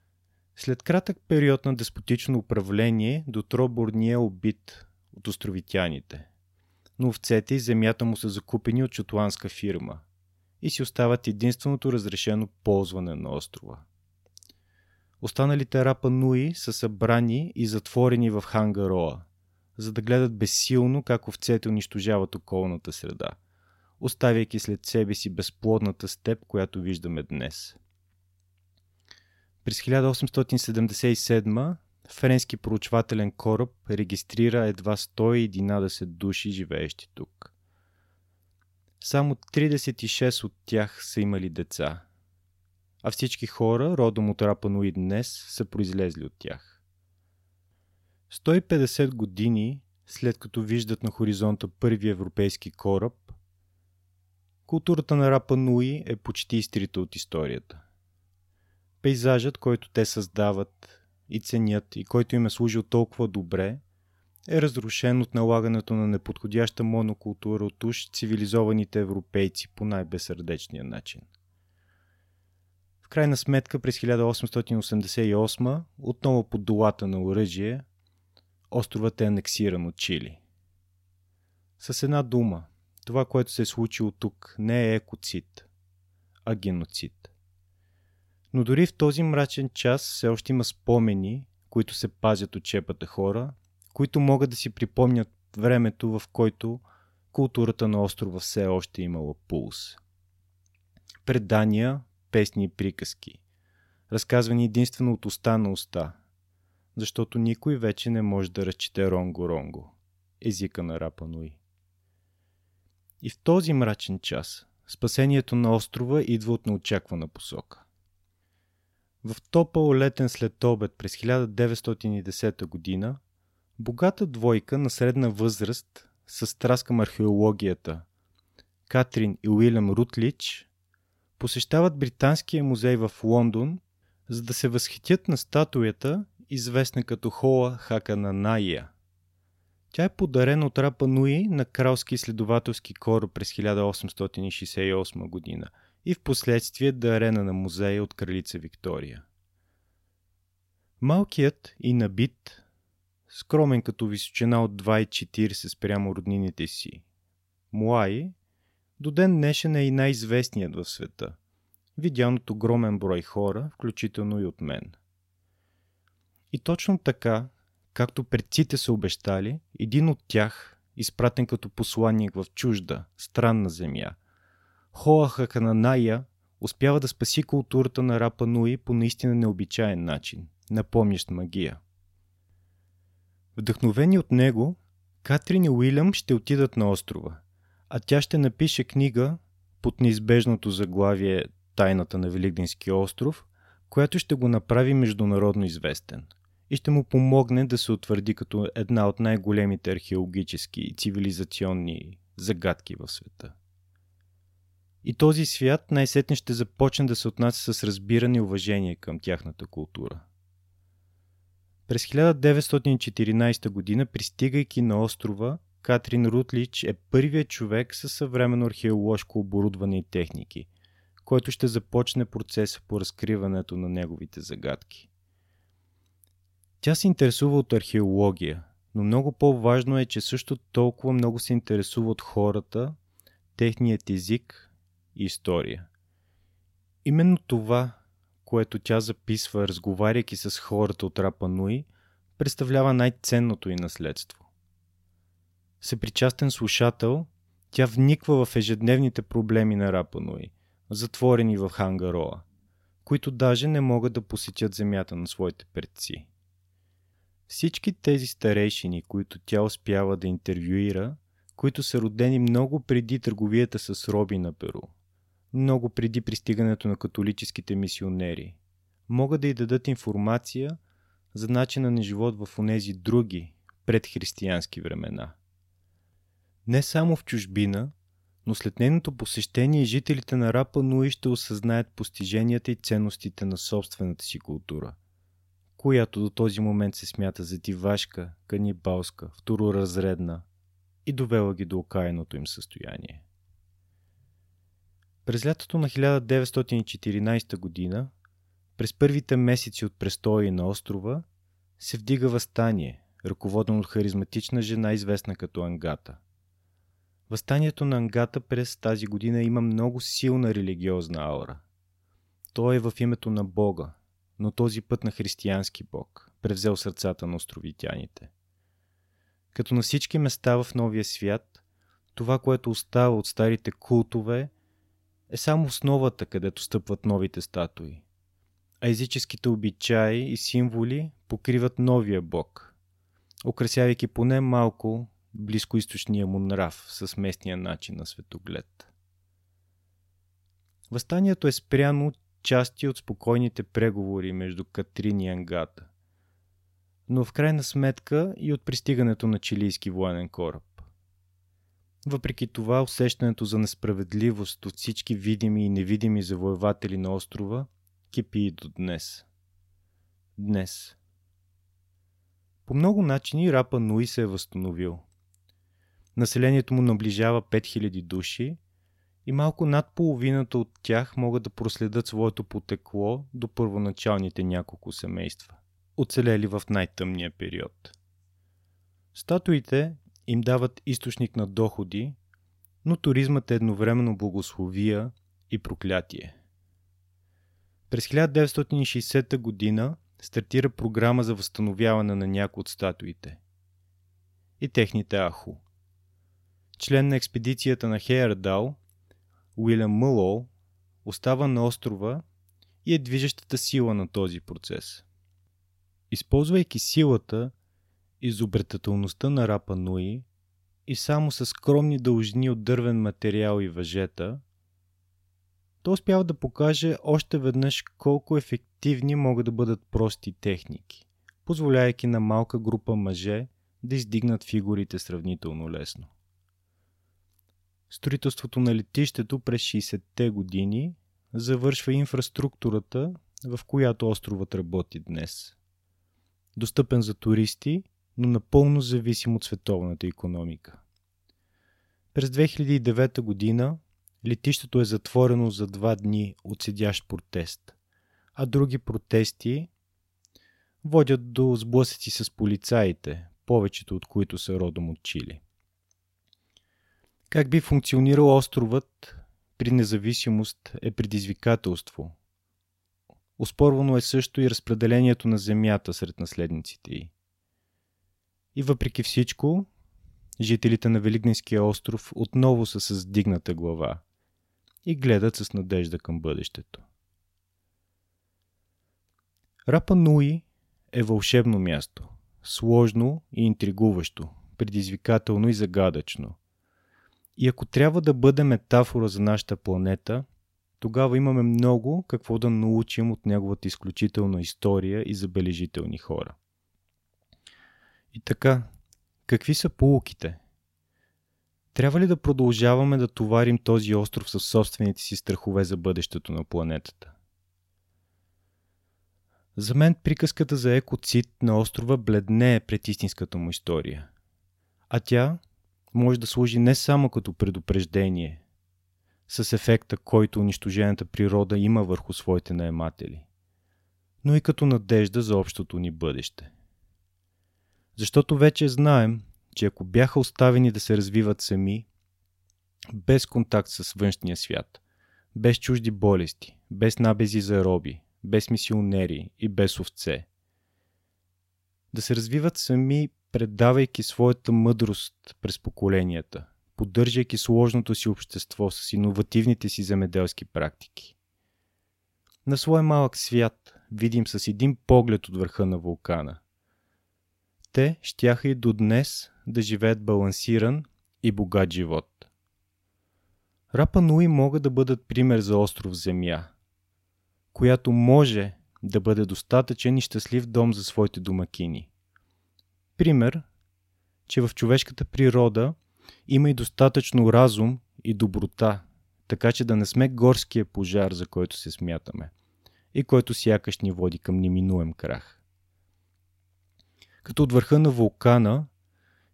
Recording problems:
none

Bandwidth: 16 kHz